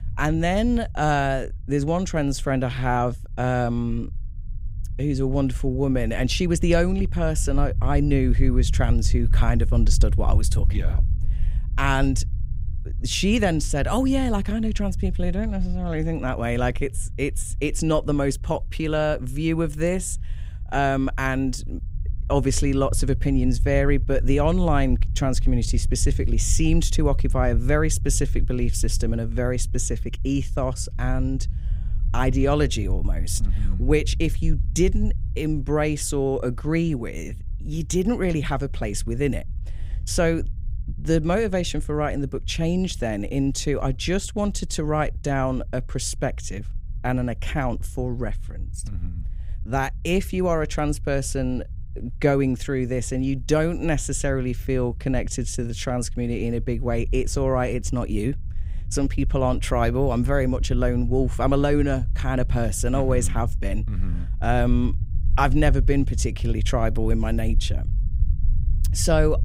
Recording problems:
low rumble; faint; throughout; 20 dB below the speech

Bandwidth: 15.5 kHz